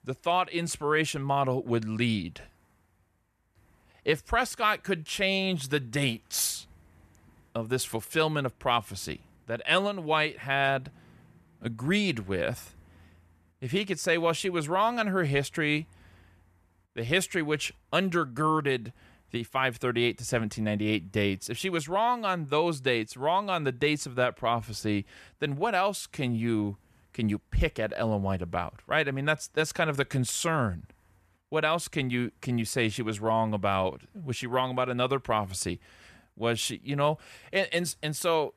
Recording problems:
none

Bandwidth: 14 kHz